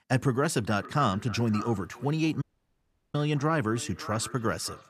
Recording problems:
echo of what is said; noticeable; throughout; 570 ms later, 15 dB below the speech
audio cutting out; at 2.5 s for 0.5 s

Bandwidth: 14.5 kHz